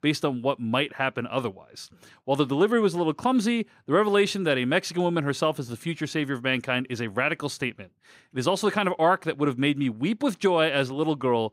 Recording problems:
none

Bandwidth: 15.5 kHz